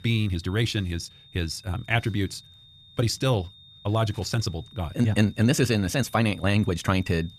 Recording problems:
wrong speed, natural pitch; too fast; 1.6 times normal speed
high-pitched whine; faint; throughout; 3.5 kHz, 25 dB below the speech

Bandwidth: 14.5 kHz